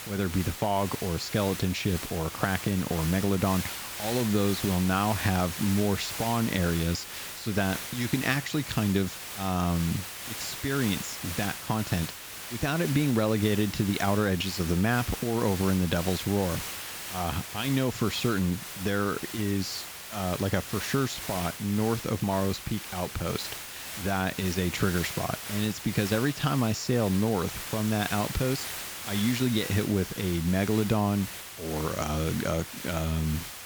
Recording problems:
high frequencies cut off; noticeable; nothing above 8 kHz
hiss; loud; throughout; 7 dB below the speech

